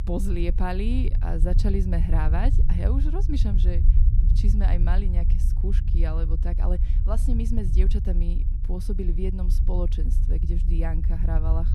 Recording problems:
low rumble; loud; throughout; 8 dB below the speech

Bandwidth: 14.5 kHz